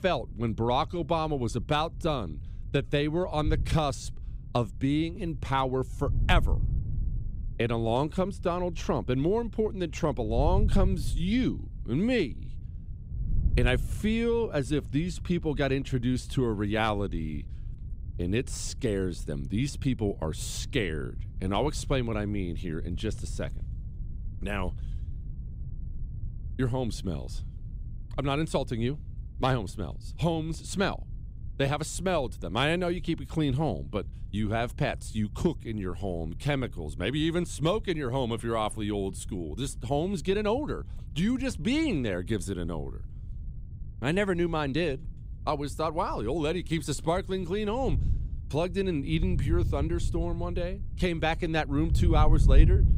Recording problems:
wind noise on the microphone; occasional gusts; 20 dB below the speech

